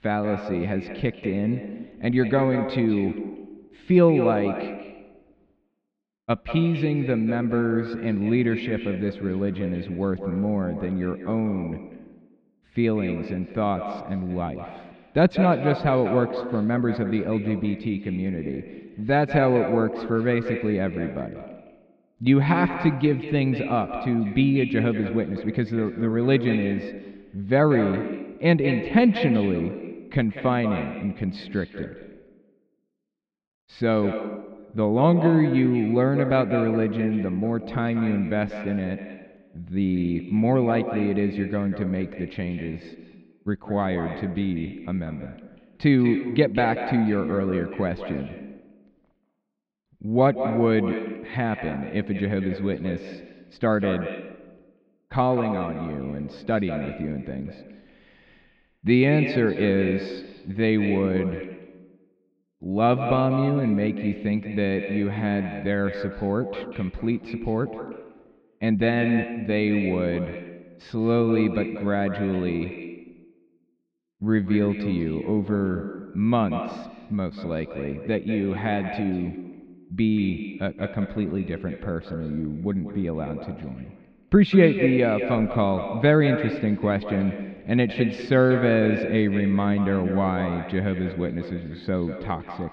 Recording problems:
echo of what is said; strong; throughout; 190 ms later, 9 dB below the speech
muffled; slightly; fading above 3.5 kHz

